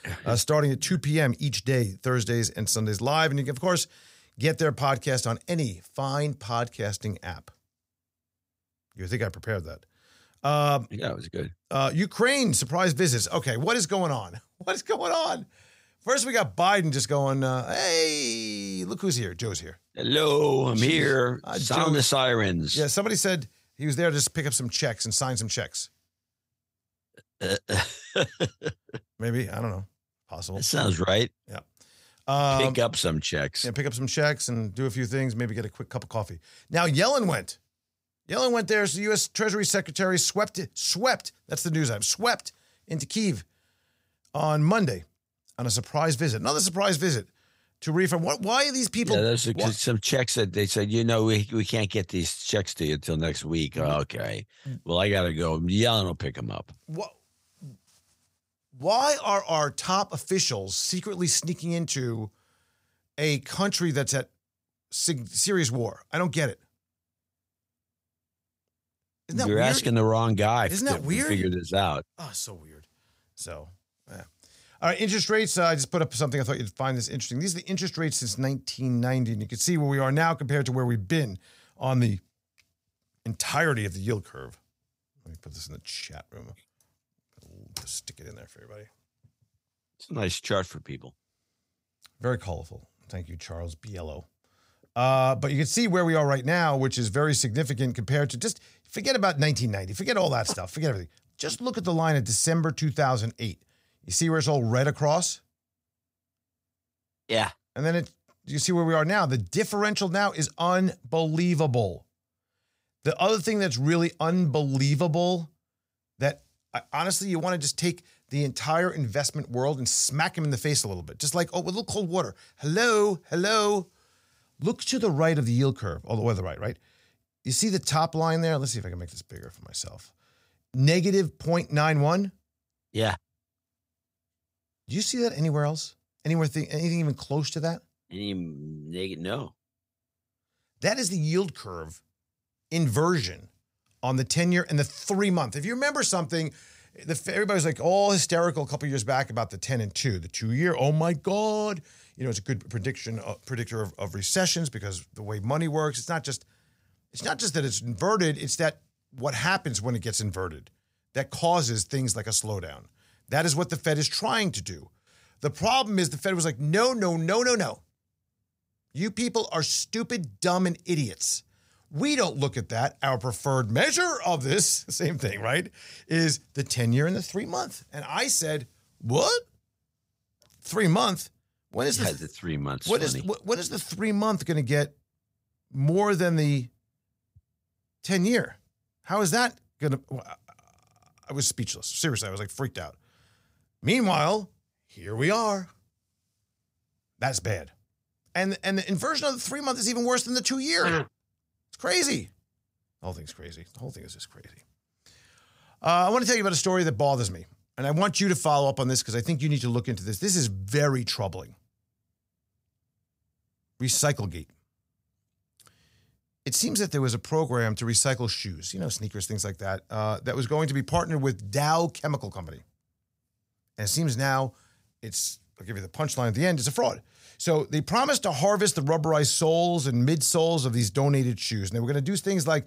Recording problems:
none

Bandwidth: 15.5 kHz